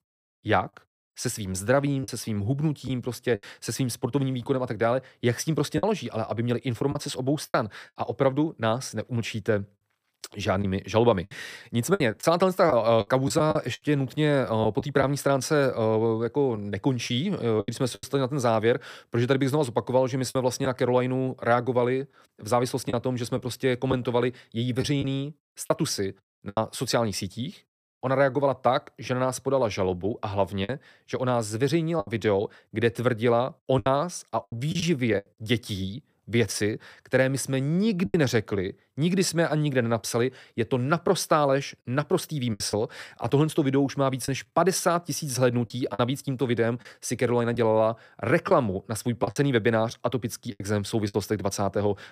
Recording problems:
choppy; occasionally; 5% of the speech affected

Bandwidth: 15 kHz